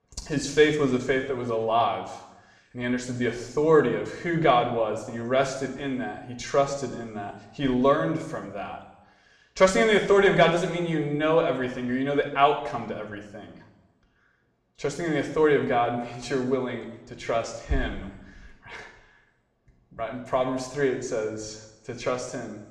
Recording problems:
room echo; slight; dies away in 0.9 s
off-mic speech; somewhat distant

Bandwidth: 14.5 kHz